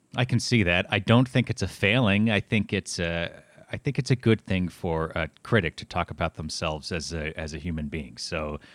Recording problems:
none

